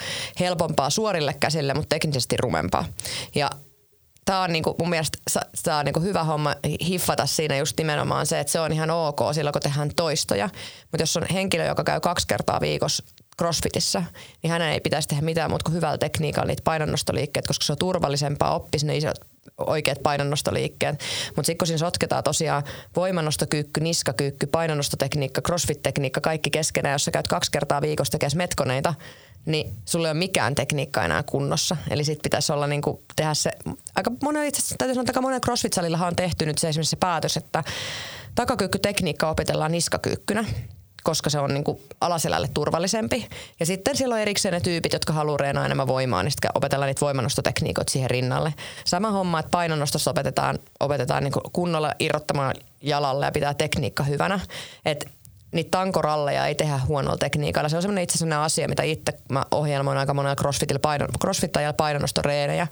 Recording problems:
squashed, flat; heavily

